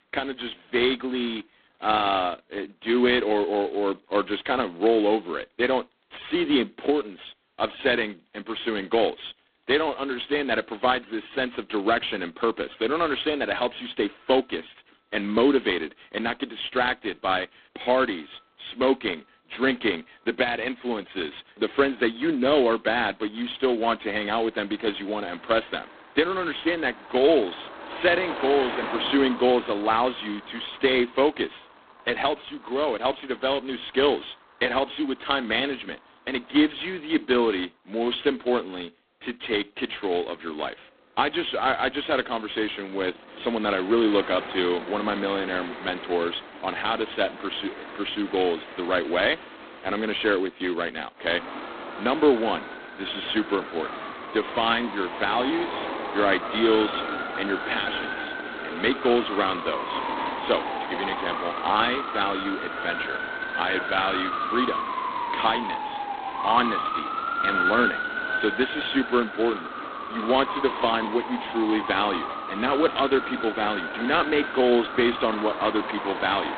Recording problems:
phone-call audio; poor line
traffic noise; loud; throughout; 6 dB below the speech

